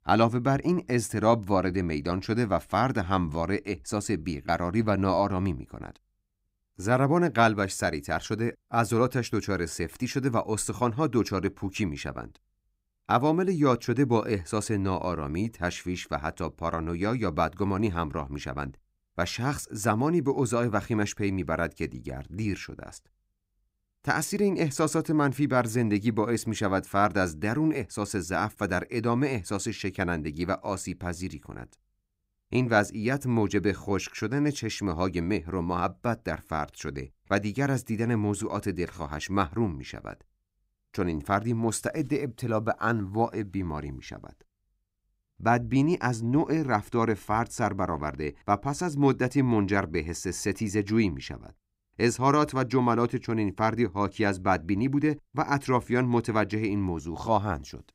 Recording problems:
none

